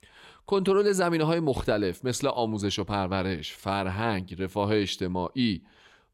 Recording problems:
none

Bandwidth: 16 kHz